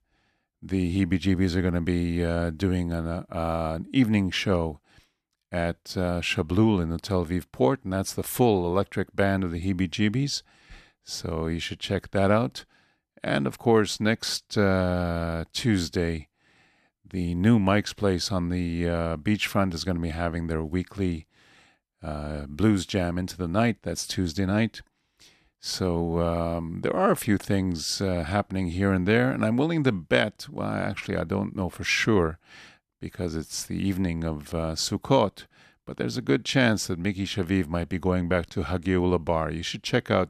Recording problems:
none

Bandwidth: 14.5 kHz